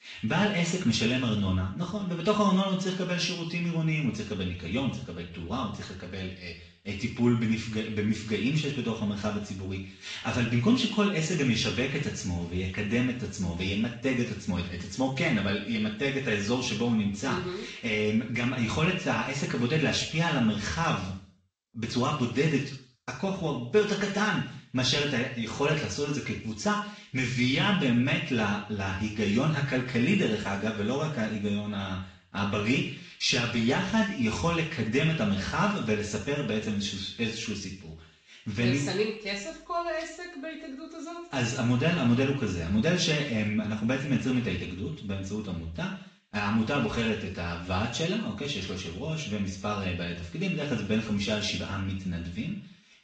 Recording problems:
off-mic speech; far
room echo; noticeable; dies away in 0.5 s
garbled, watery; slightly; nothing above 7.5 kHz

